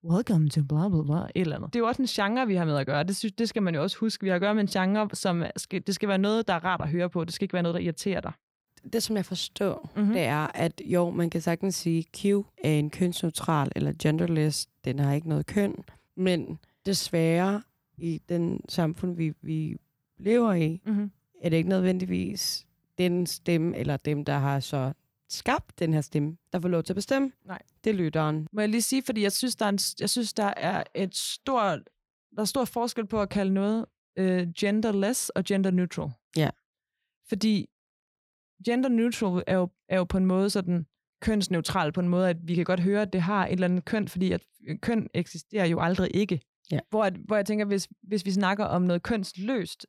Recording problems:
none

